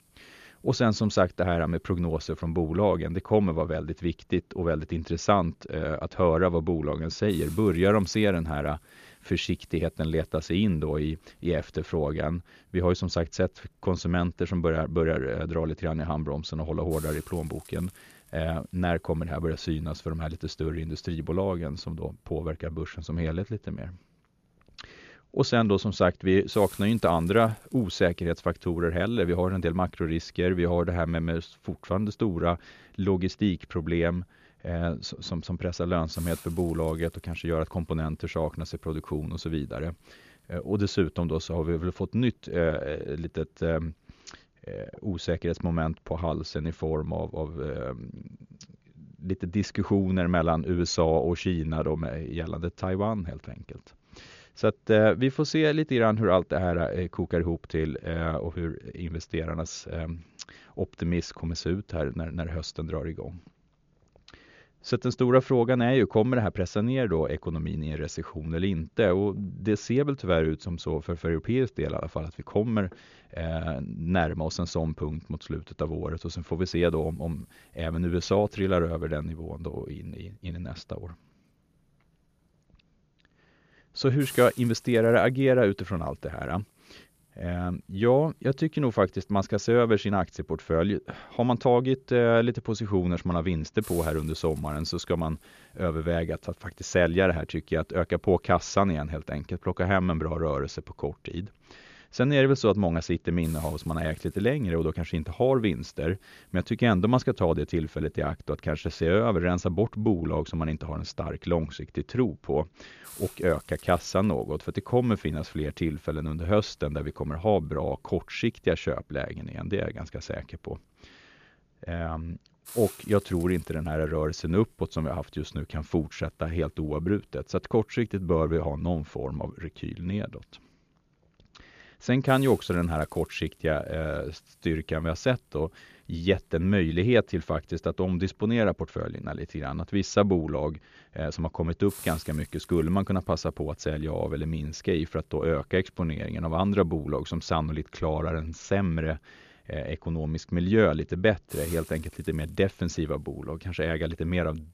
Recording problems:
high frequencies cut off; noticeable; nothing above 7 kHz
hiss; faint; until 45 s and from 1:17 on; 20 dB below the speech

